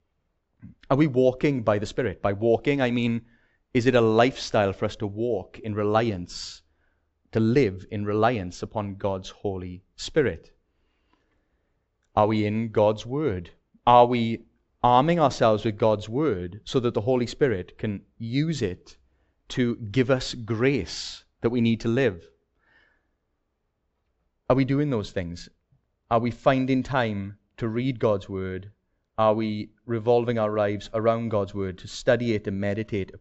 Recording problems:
high frequencies cut off; noticeable; nothing above 7.5 kHz

